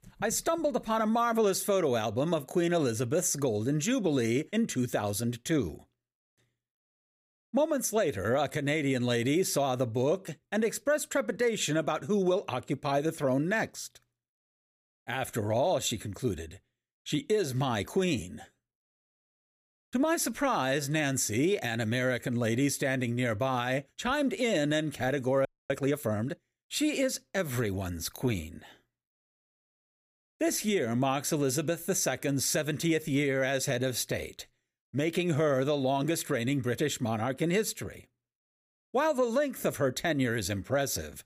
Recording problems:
audio freezing; at 25 s

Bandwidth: 15 kHz